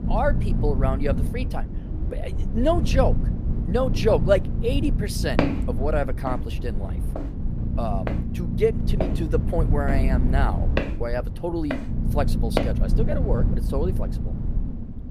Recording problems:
low rumble; noticeable; throughout; 10 dB below the speech
footsteps; loud; from 5.5 to 13 s; peak 3 dB above the speech

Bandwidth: 14.5 kHz